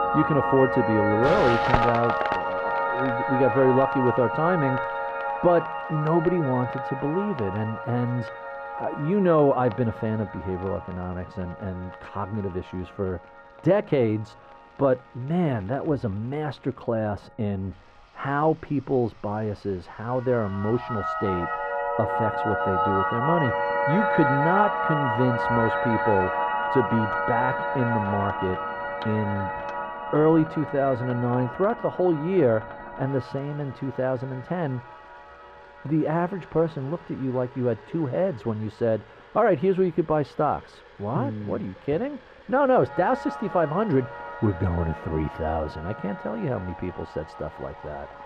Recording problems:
muffled; very; fading above 3 kHz
background music; loud; throughout; 2 dB below the speech
household noises; noticeable; throughout; 15 dB below the speech

